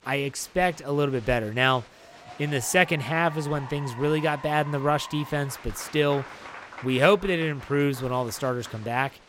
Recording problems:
crowd noise; noticeable; throughout; 15 dB below the speech

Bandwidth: 16 kHz